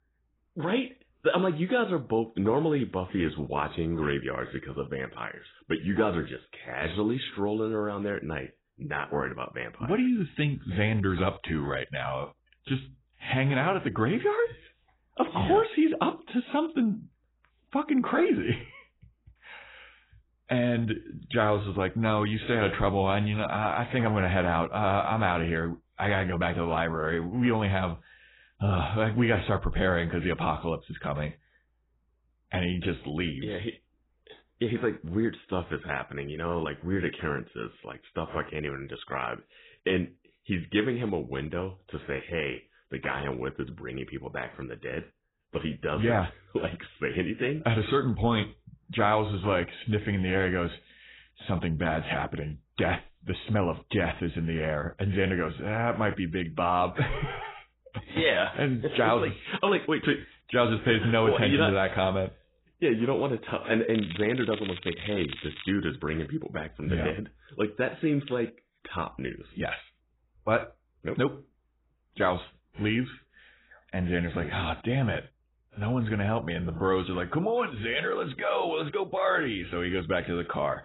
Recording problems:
garbled, watery; badly; nothing above 4 kHz
crackling; noticeable; from 1:04 to 1:06; 10 dB below the speech

